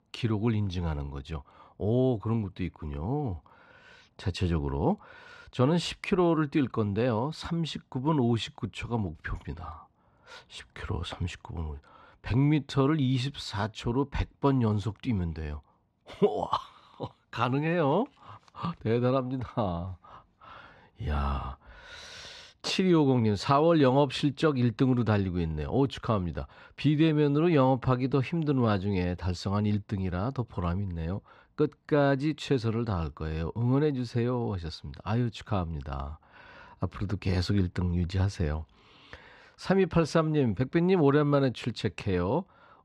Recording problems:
muffled; very slightly; fading above 4 kHz

